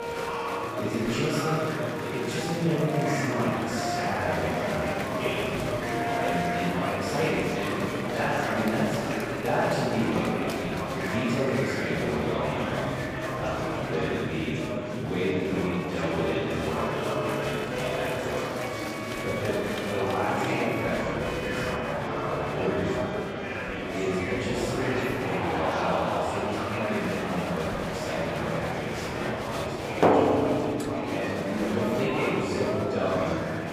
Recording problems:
room echo; strong; dies away in 1.9 s
off-mic speech; far
background music; loud; throughout; 5 dB below the speech
murmuring crowd; loud; throughout; 1 dB below the speech
clattering dishes; faint; at 31 s; peak 15 dB below the speech

